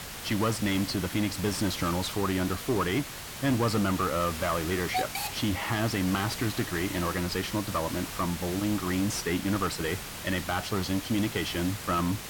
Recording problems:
distortion; slight; 10 dB below the speech
hiss; loud; throughout; 7 dB below the speech

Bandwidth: 17 kHz